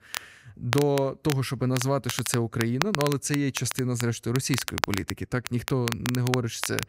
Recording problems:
crackle, like an old record; loud; 6 dB below the speech

